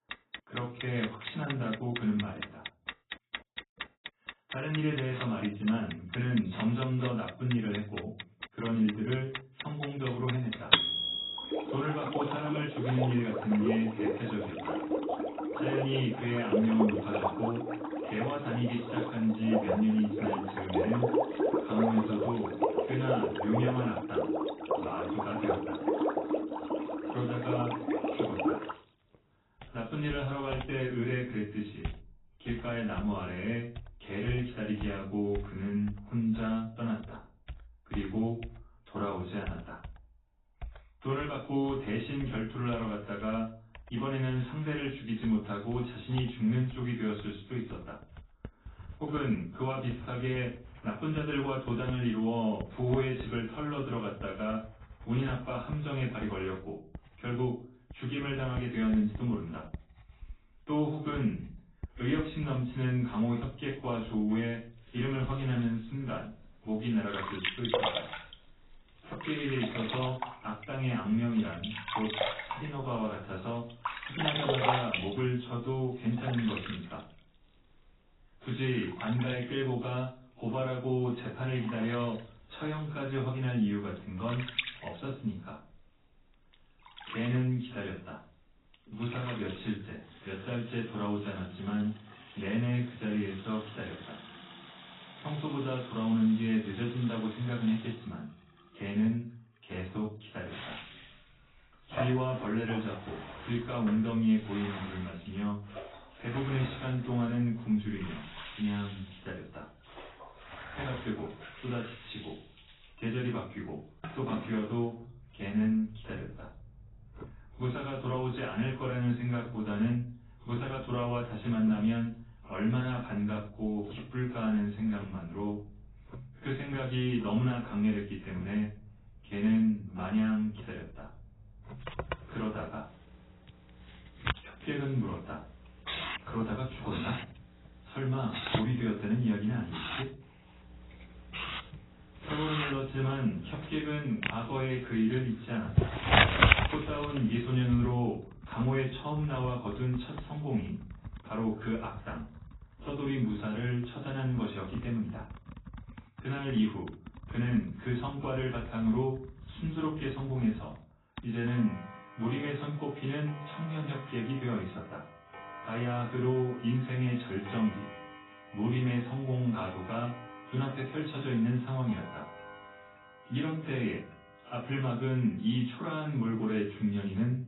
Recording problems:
off-mic speech; far
garbled, watery; badly; nothing above 4 kHz
room echo; slight; dies away in 0.4 s
household noises; loud; throughout; 3 dB below the speech

